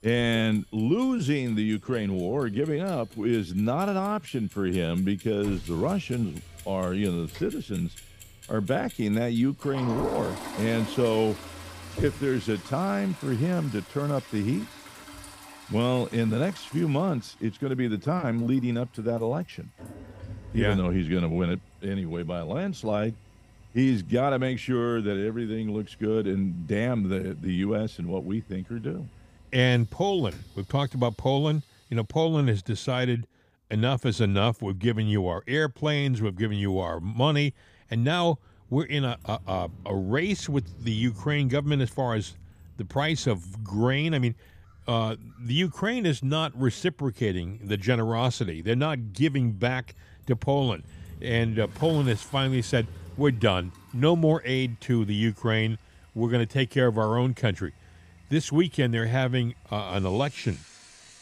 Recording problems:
household noises; noticeable; throughout; 20 dB below the speech
traffic noise; faint; throughout; 20 dB below the speech

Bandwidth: 15 kHz